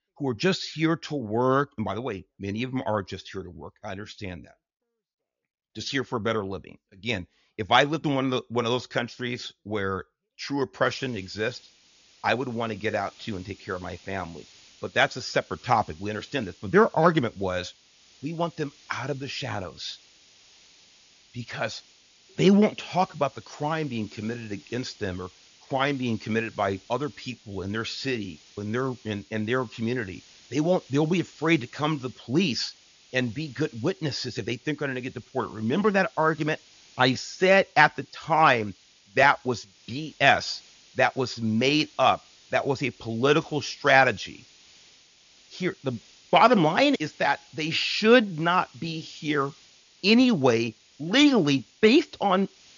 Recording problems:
high frequencies cut off; noticeable; nothing above 7 kHz
hiss; faint; from 11 s on; 25 dB below the speech

